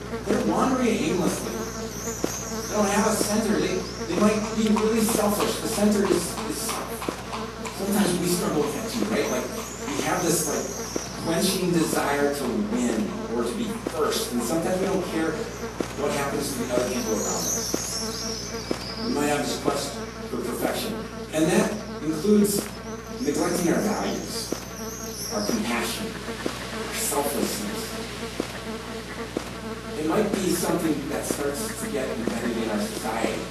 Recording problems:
off-mic speech; far
room echo; noticeable; dies away in 0.5 s
garbled, watery; slightly; nothing above 12.5 kHz
electrical hum; loud; throughout; 60 Hz, 7 dB below the speech
animal sounds; loud; throughout; 9 dB below the speech

